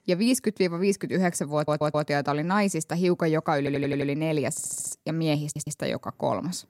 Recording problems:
audio stuttering; 4 times, first at 1.5 s

